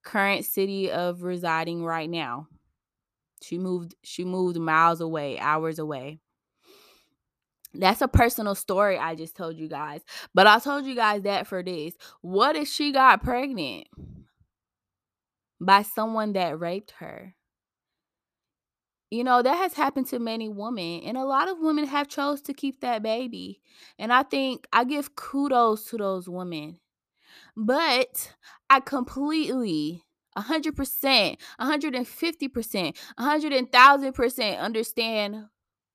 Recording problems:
none

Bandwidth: 14.5 kHz